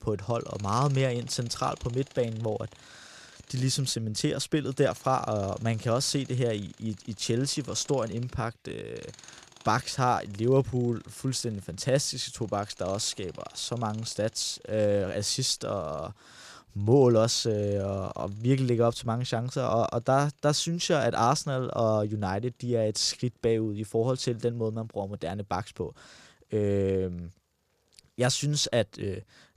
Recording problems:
machinery noise; faint; throughout; 25 dB below the speech

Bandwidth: 14.5 kHz